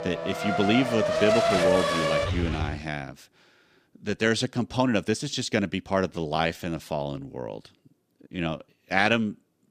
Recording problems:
traffic noise; very loud; until 2.5 s; 1 dB above the speech
uneven, jittery; strongly; from 2 to 8.5 s

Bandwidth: 14.5 kHz